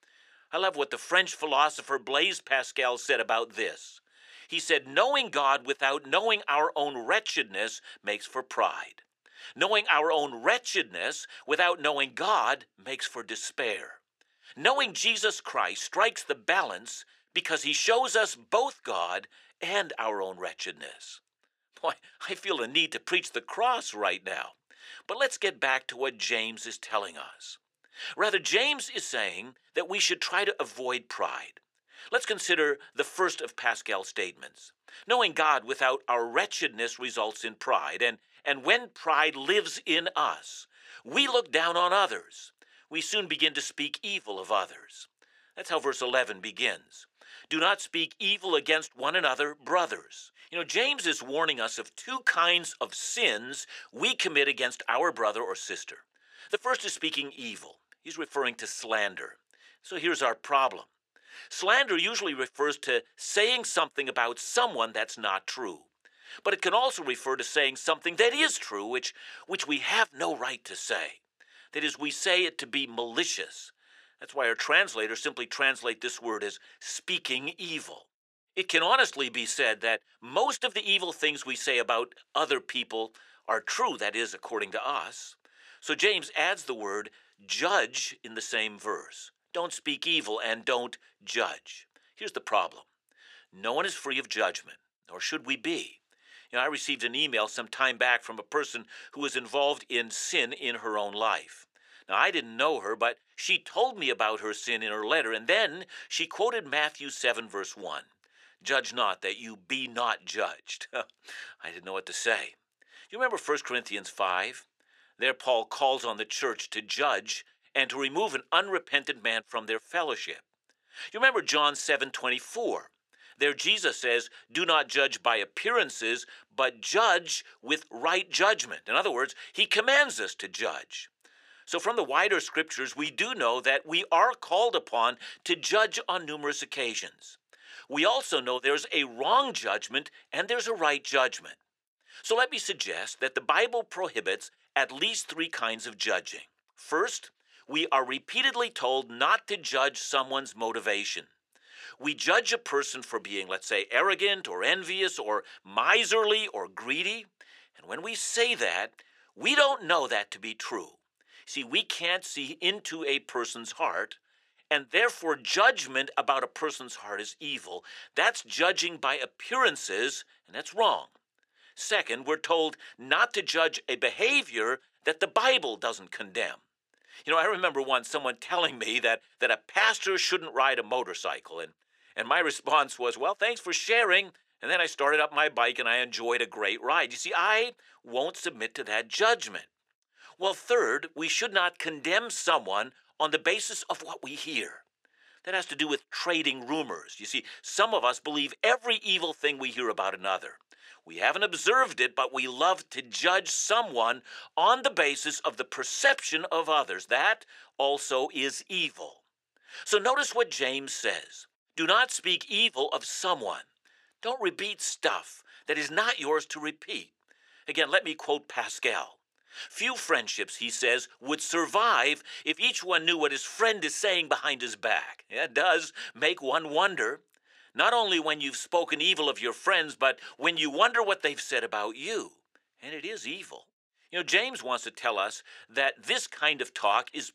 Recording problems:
thin; very; fading below 400 Hz

